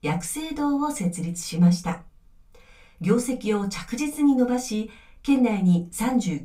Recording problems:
off-mic speech; far
room echo; very slight; dies away in 0.2 s

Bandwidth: 15.5 kHz